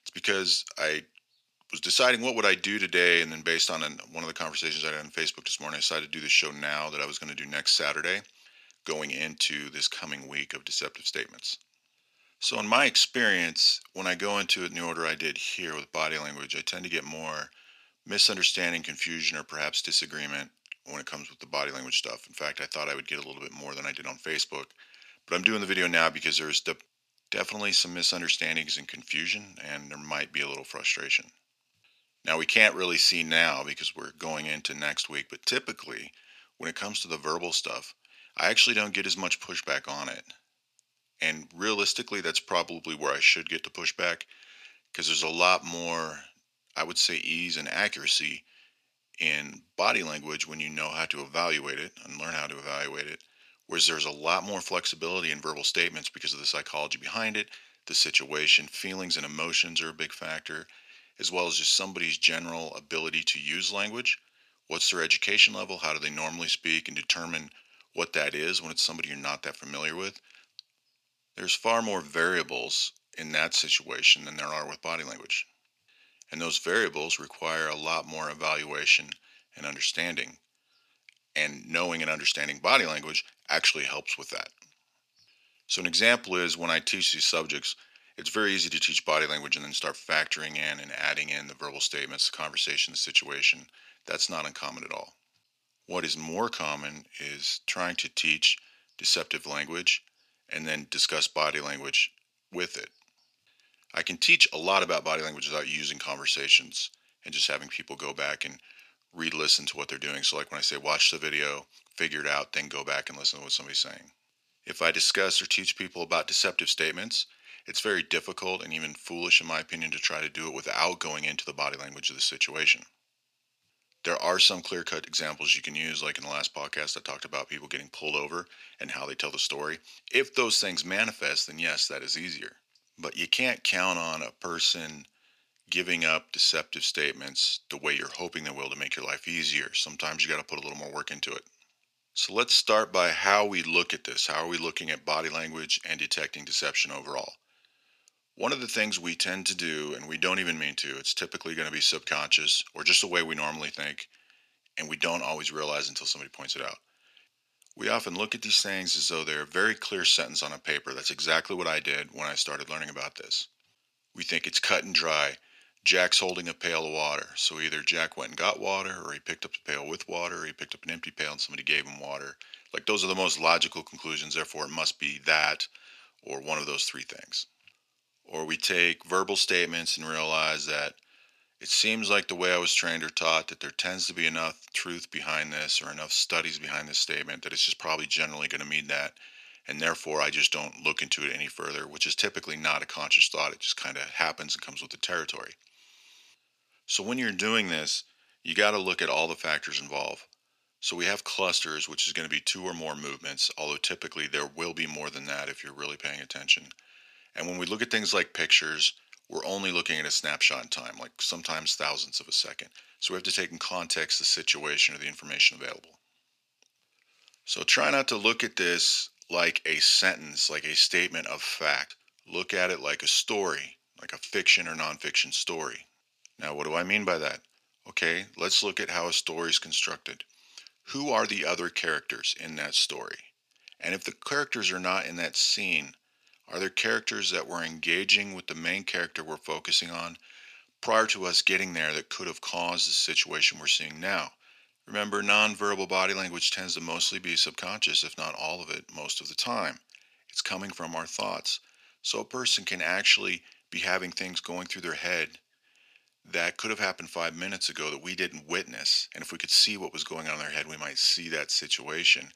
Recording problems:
thin; very; fading below 600 Hz

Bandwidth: 14.5 kHz